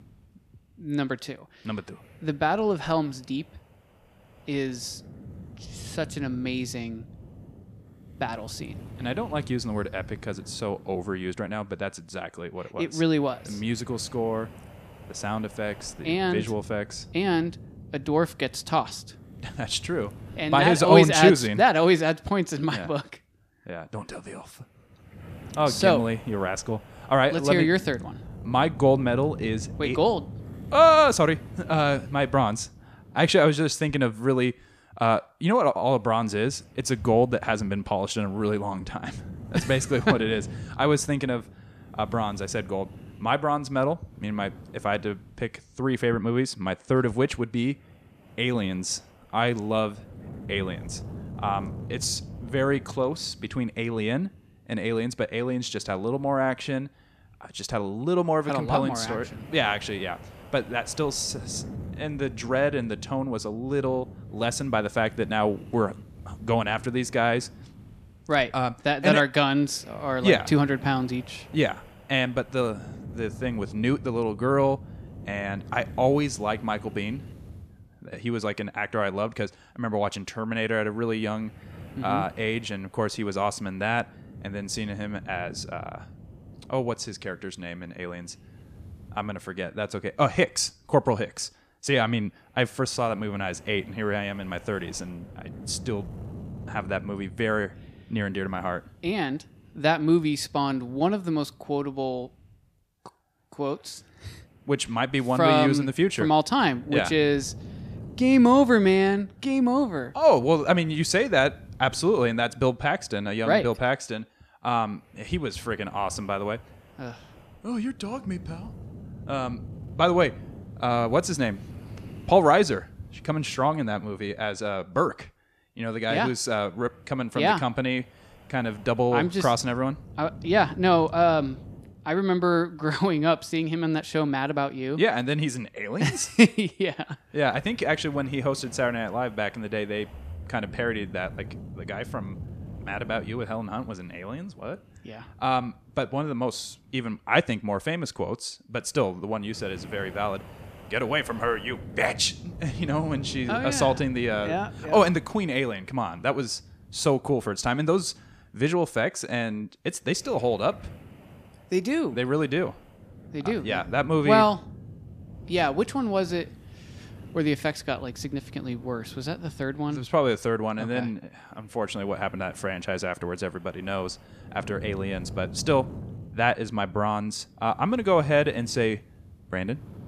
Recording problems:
wind noise on the microphone; occasional gusts; 25 dB below the speech

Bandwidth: 14.5 kHz